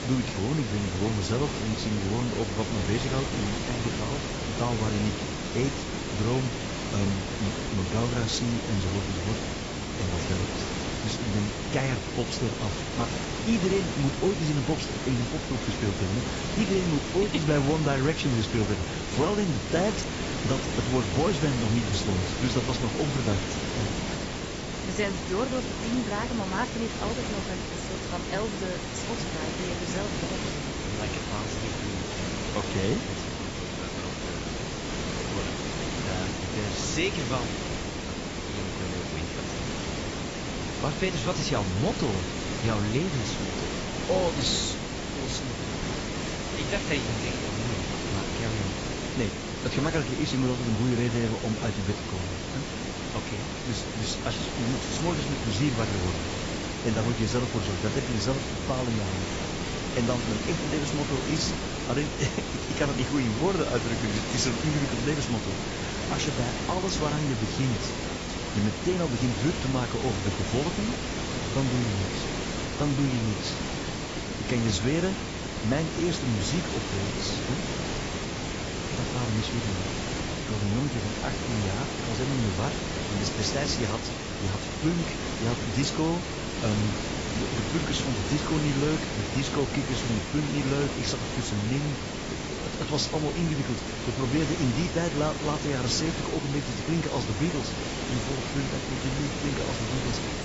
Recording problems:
garbled, watery; badly; nothing above 7.5 kHz
hiss; loud; throughout; 1 dB below the speech

